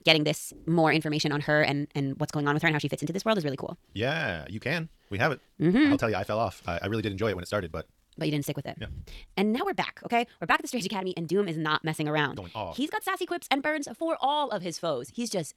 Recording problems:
wrong speed, natural pitch; too fast; 1.8 times normal speed

